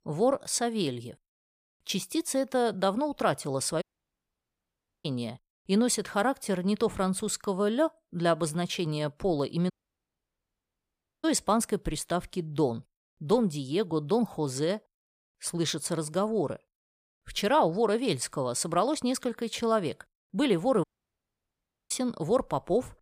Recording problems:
audio cutting out; at 4 s for 1 s, at 9.5 s for 1.5 s and at 21 s for 1 s

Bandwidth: 15 kHz